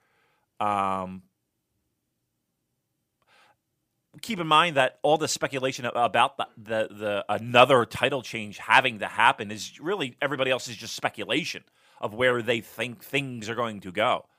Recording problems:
none

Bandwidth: 15 kHz